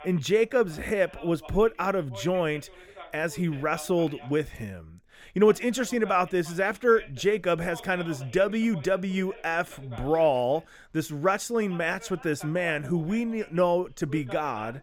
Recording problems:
voice in the background; noticeable; throughout; 20 dB below the speech

